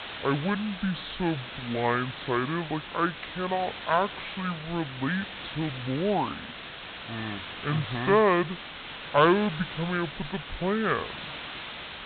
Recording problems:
high frequencies cut off; severe; nothing above 4 kHz
wrong speed and pitch; too slow and too low; 0.6 times normal speed
hiss; loud; throughout; 10 dB below the speech

